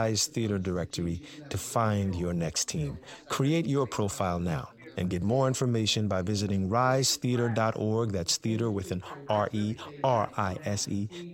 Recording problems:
background chatter; noticeable; throughout; 2 voices, 20 dB below the speech
abrupt cut into speech; at the start

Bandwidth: 16 kHz